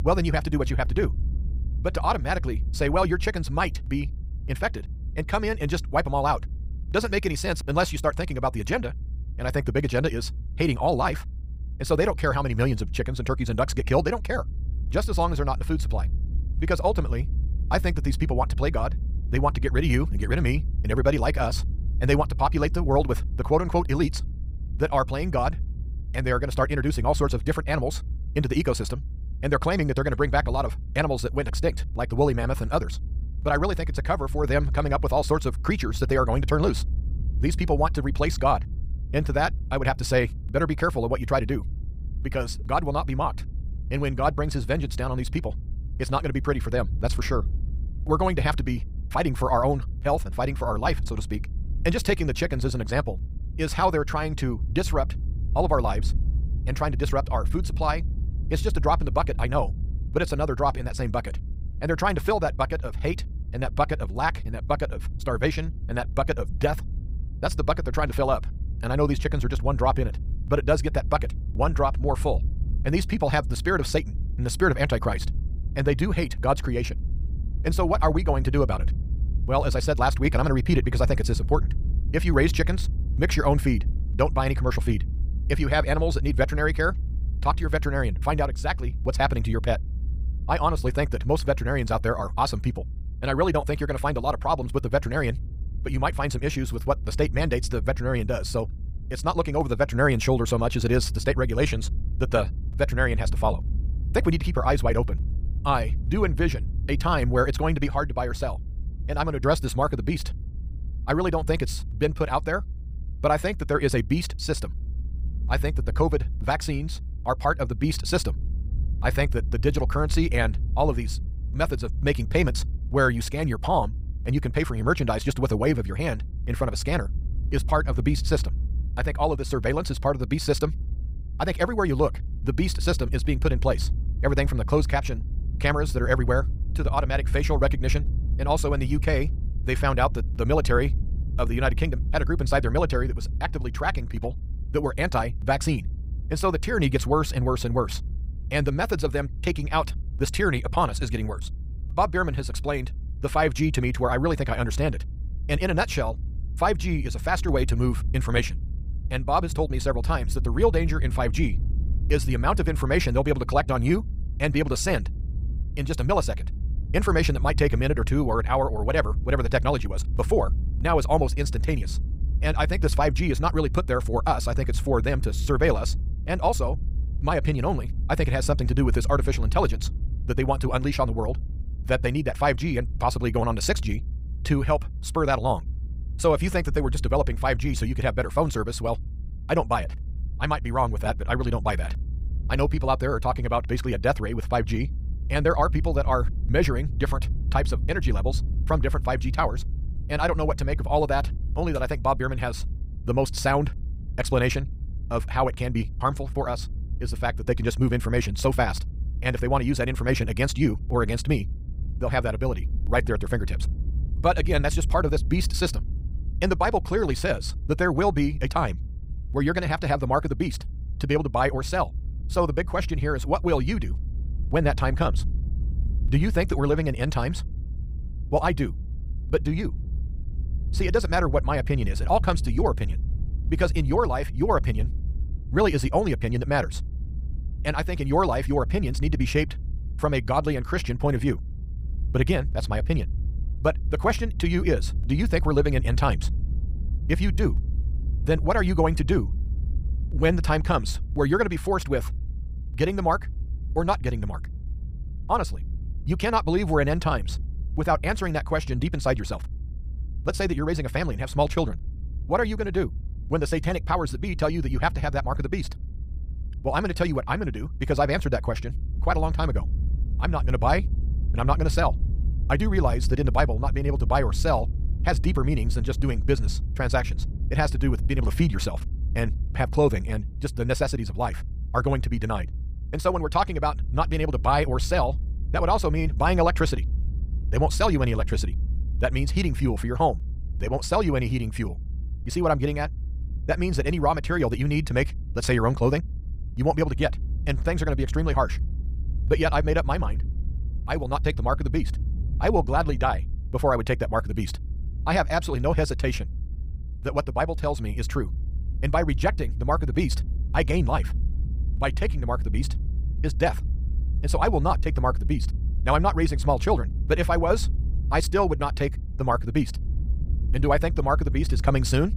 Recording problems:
wrong speed, natural pitch; too fast; 1.7 times normal speed
low rumble; faint; throughout; 20 dB below the speech

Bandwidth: 15.5 kHz